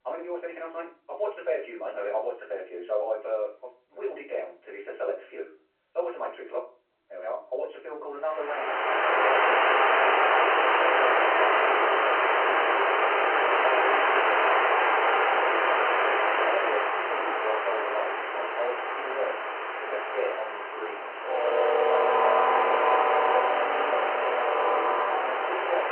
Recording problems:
off-mic speech; far
wrong speed, natural pitch; too fast; 1.5 times normal speed
phone-call audio
room echo; very slight; dies away in 0.3 s
train or aircraft noise; very loud; from 9 s on; 10 dB above the speech

